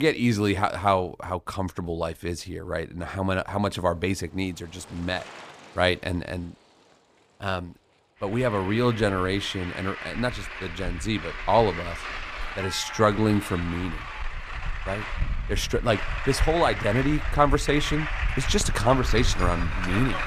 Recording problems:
traffic noise; loud; throughout; 7 dB below the speech
abrupt cut into speech; at the start

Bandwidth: 15 kHz